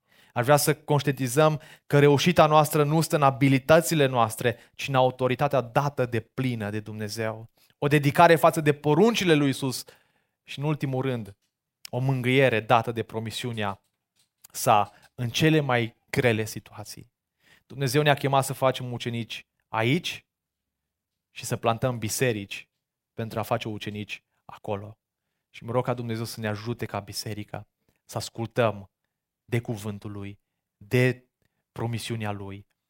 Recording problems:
none

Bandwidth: 16 kHz